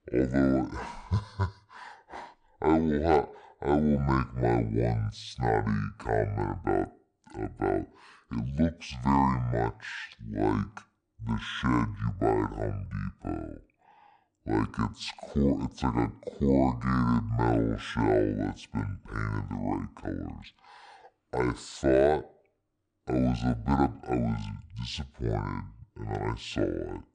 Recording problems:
wrong speed and pitch; too slow and too low; 0.6 times normal speed

